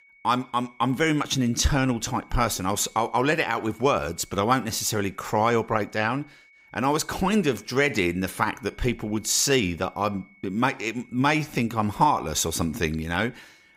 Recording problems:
high-pitched whine; faint; throughout; 2 kHz, 30 dB below the speech

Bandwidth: 15.5 kHz